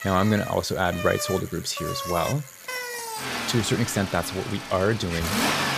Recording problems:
traffic noise; loud; throughout; 5 dB below the speech

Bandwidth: 15 kHz